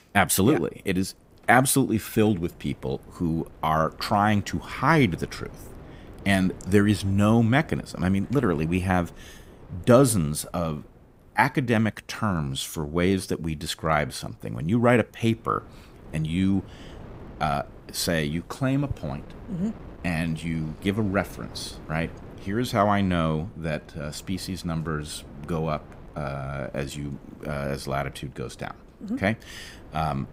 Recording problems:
wind noise on the microphone; occasional gusts; 25 dB below the speech

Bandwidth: 15.5 kHz